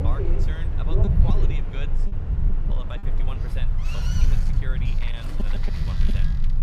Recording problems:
train or aircraft noise; very loud; throughout; 1 dB above the speech
low rumble; loud; throughout; 1 dB below the speech
choppy; occasionally; at 2.5 s; 4% of the speech affected

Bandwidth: 14 kHz